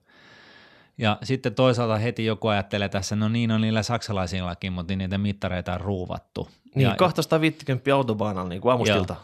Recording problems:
none

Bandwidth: 14 kHz